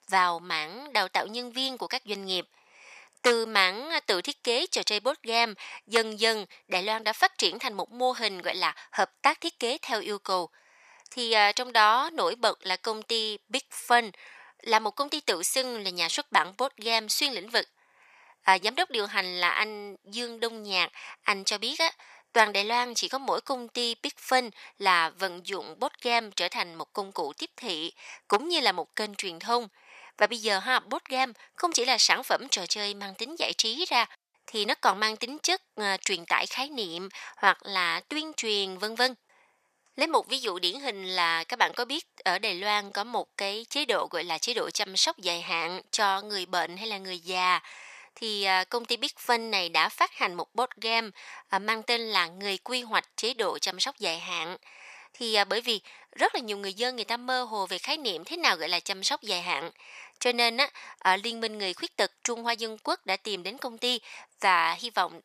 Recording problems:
thin; very; fading below 1 kHz

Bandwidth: 14.5 kHz